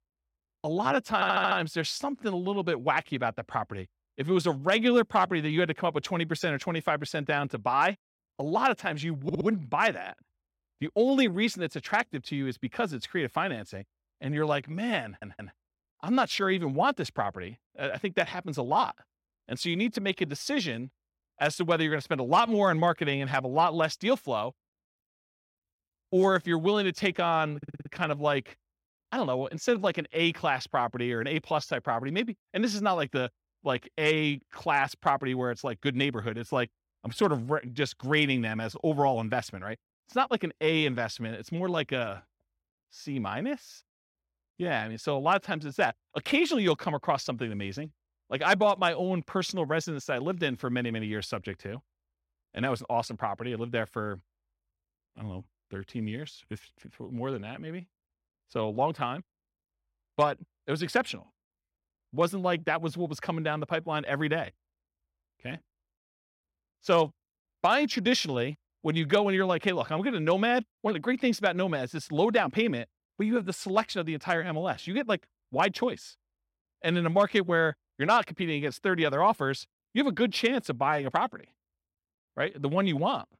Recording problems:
audio stuttering; 4 times, first at 1 s

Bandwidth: 16 kHz